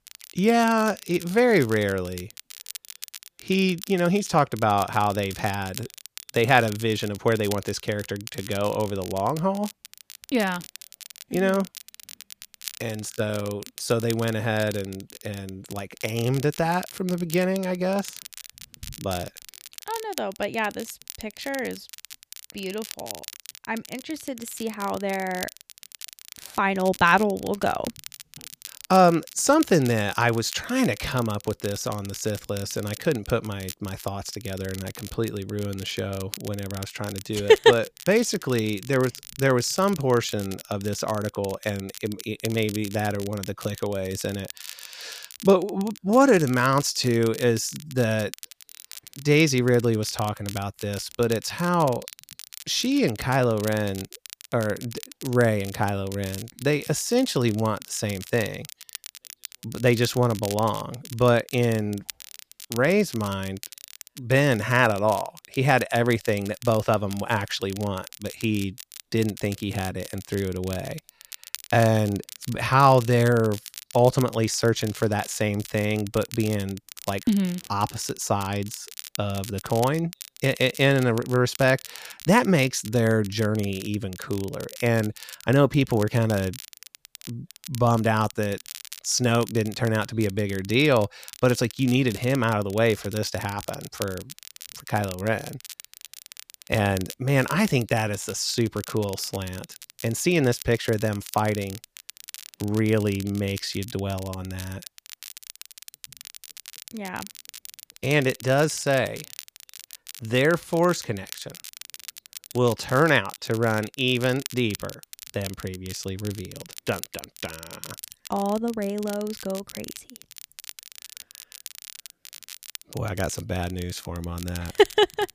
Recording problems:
crackle, like an old record; noticeable; 15 dB below the speech

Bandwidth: 15 kHz